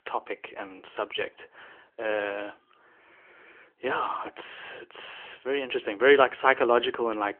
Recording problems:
phone-call audio; nothing above 3 kHz

